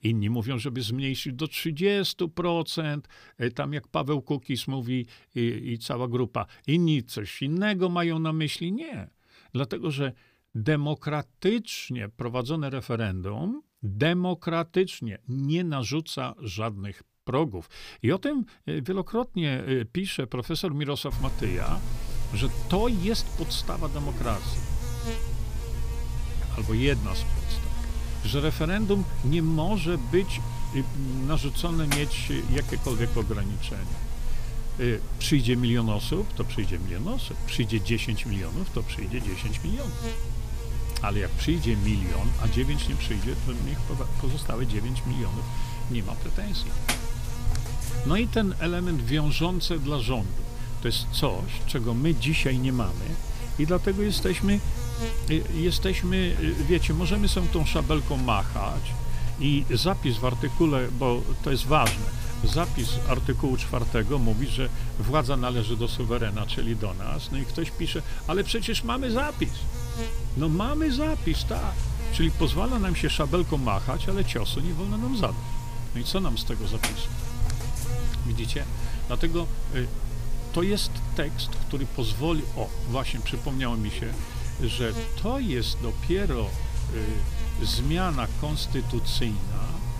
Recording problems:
electrical hum; very faint; from 21 s on; 60 Hz, 10 dB below the speech

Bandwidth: 15 kHz